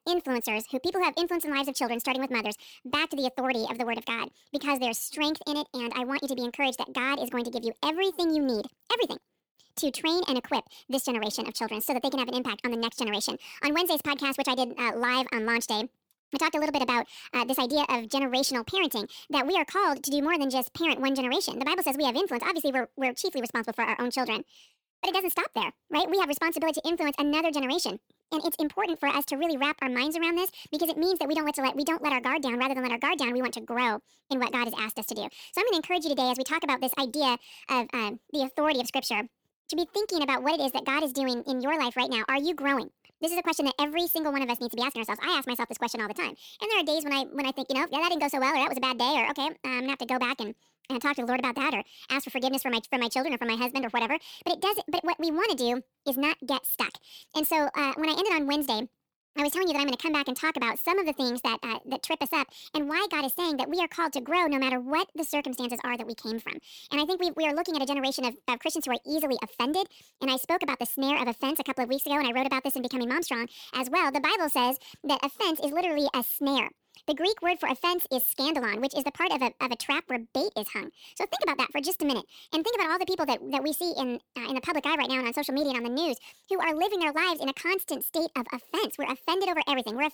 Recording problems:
wrong speed and pitch; too fast and too high; 1.5 times normal speed

